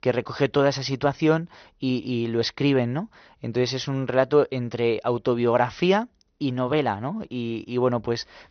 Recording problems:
high frequencies cut off; noticeable; nothing above 6 kHz

